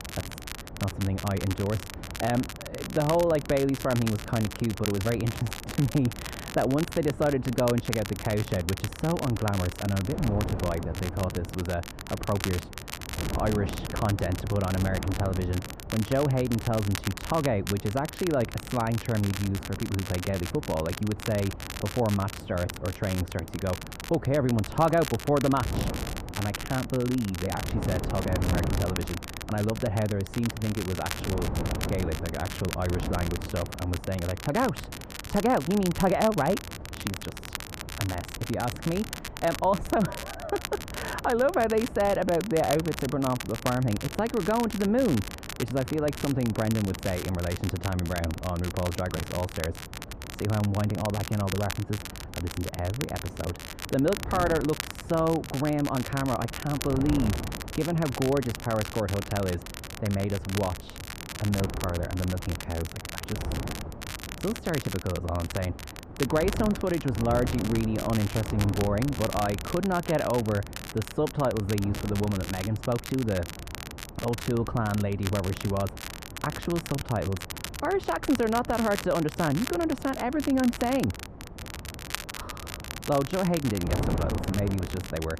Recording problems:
muffled; very; fading above 2 kHz
wind noise on the microphone; occasional gusts; 15 dB below the speech
crackle, like an old record; noticeable; 10 dB below the speech

